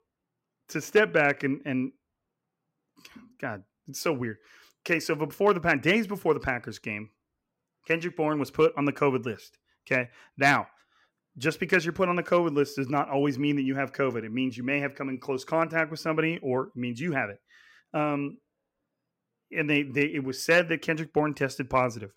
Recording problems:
none

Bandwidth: 16 kHz